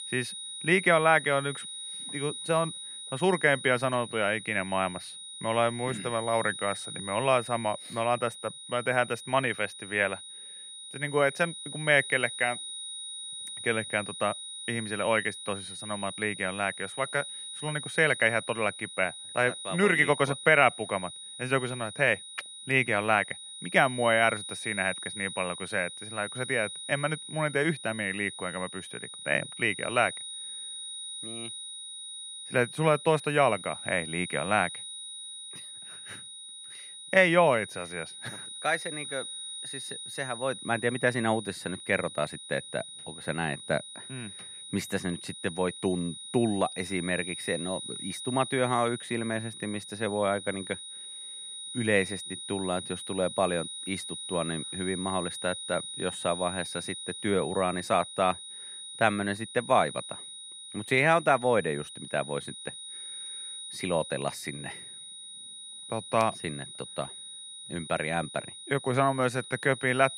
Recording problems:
high-pitched whine; loud; throughout; 4 kHz, 10 dB below the speech

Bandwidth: 14.5 kHz